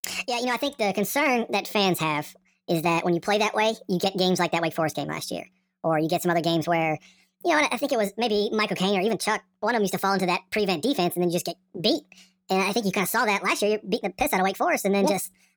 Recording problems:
wrong speed and pitch; too fast and too high; 1.5 times normal speed

